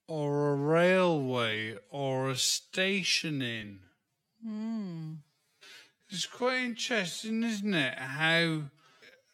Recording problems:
wrong speed, natural pitch; too slow; 0.5 times normal speed

